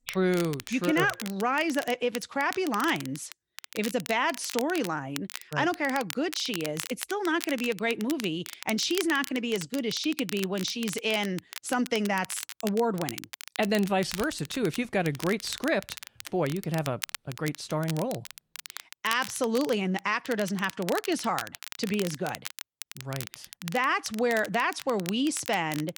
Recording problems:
crackle, like an old record; noticeable; 10 dB below the speech

